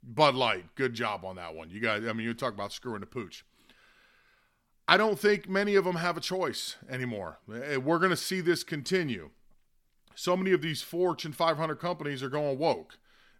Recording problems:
none

